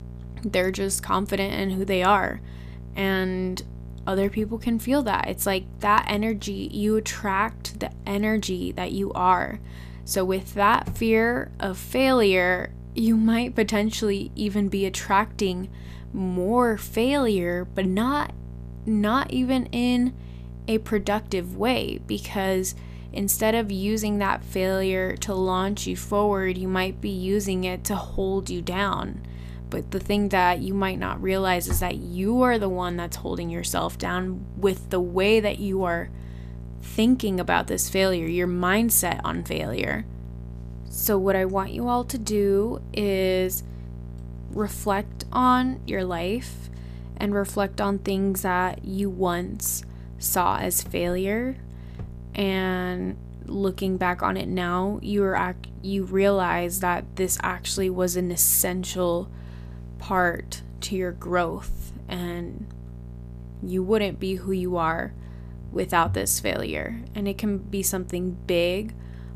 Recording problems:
electrical hum; faint; throughout; 60 Hz, 25 dB below the speech

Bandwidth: 14.5 kHz